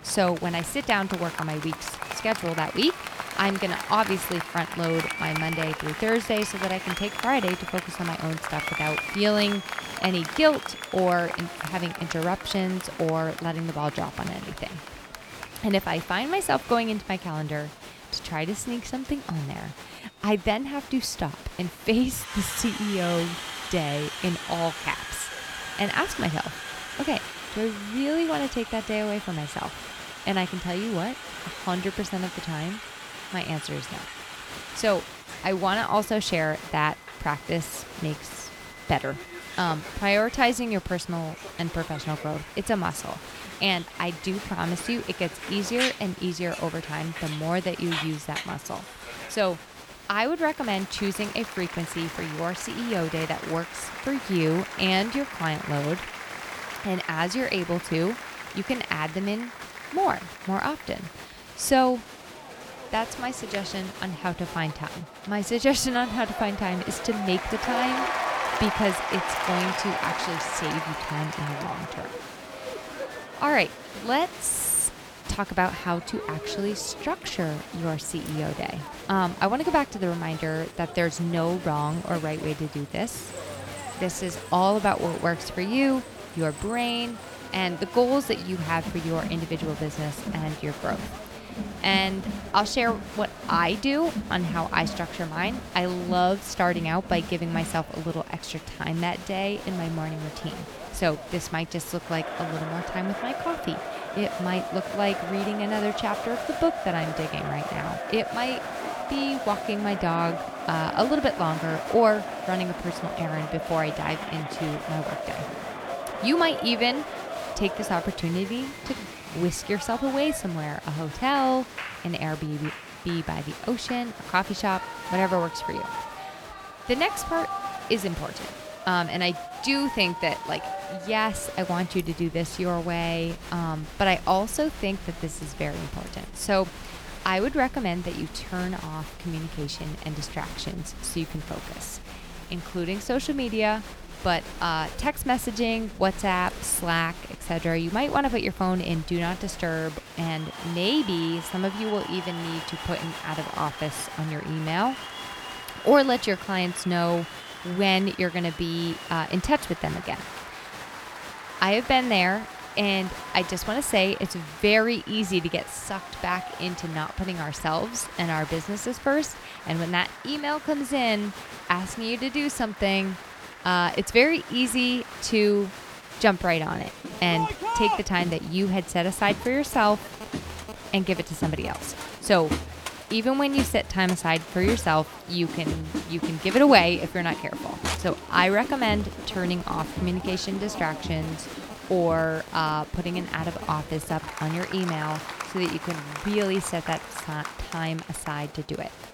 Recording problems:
crowd noise; loud; throughout; 9 dB below the speech

